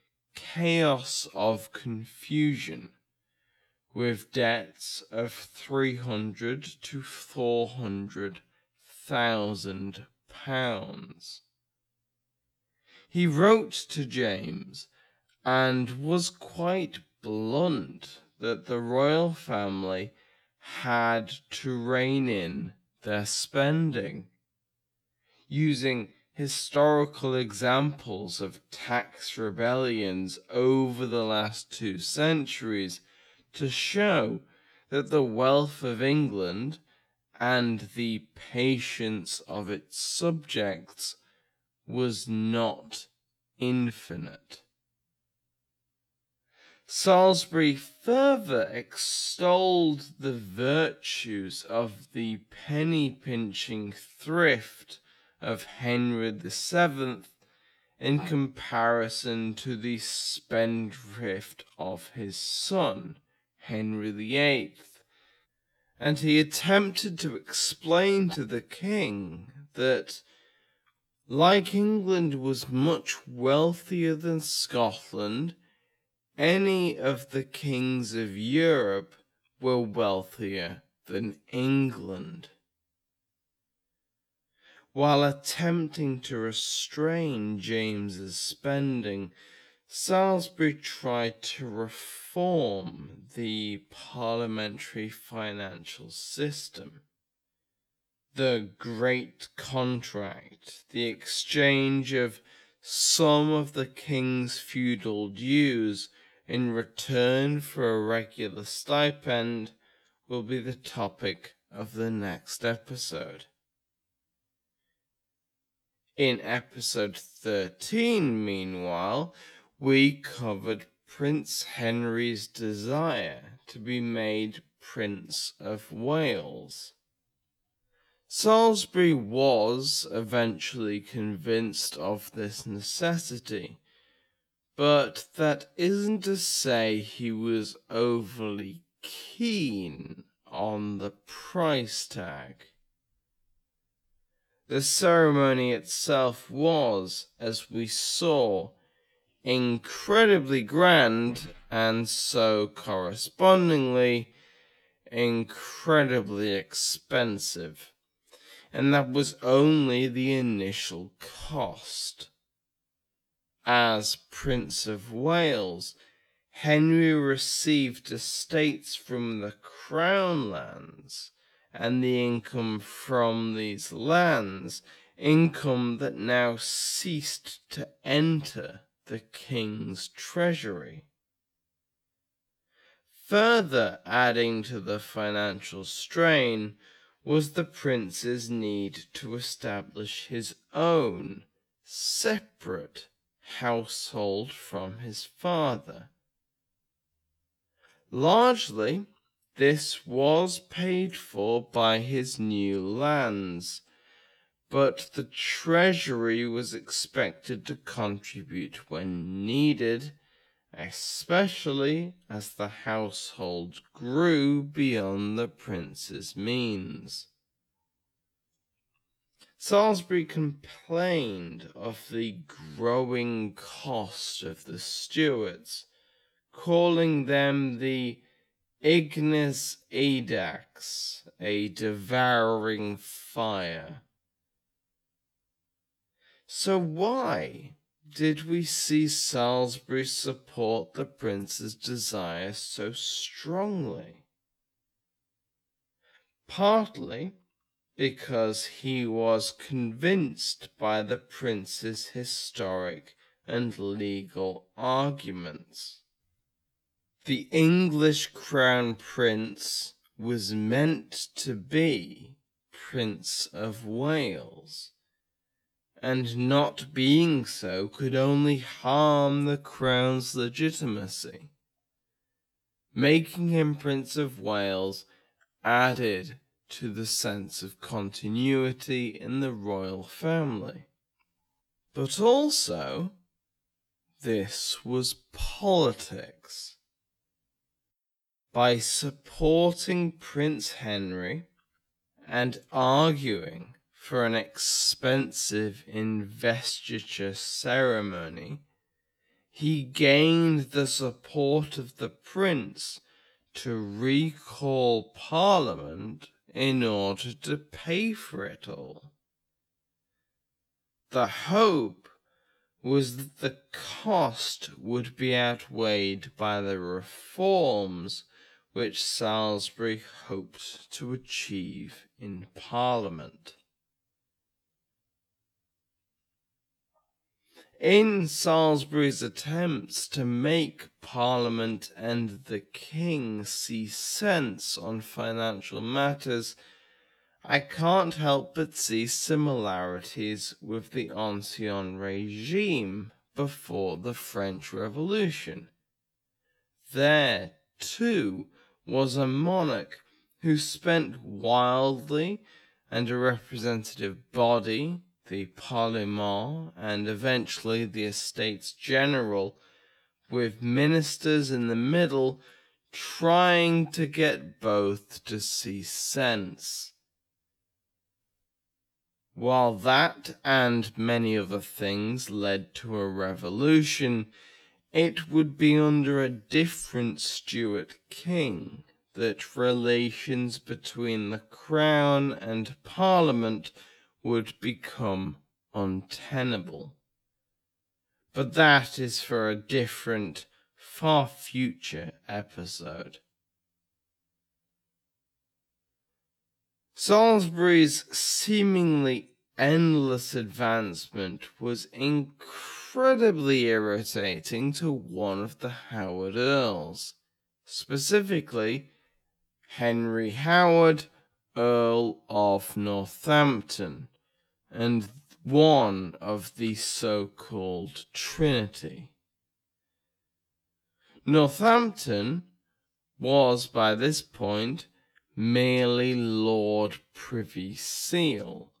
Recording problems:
wrong speed, natural pitch; too slow; 0.6 times normal speed

